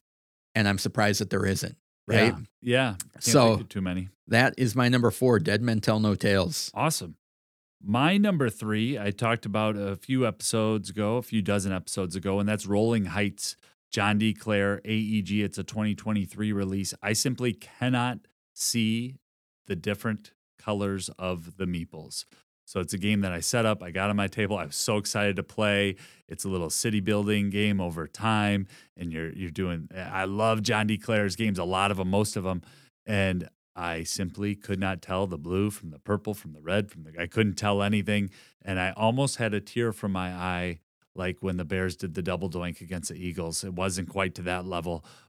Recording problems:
none

